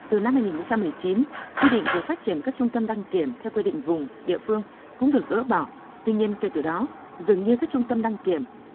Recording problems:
phone-call audio; poor line
traffic noise; loud; throughout; 9 dB below the speech

